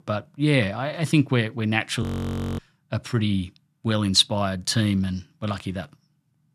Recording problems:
audio freezing; at 2 s for 0.5 s

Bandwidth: 13.5 kHz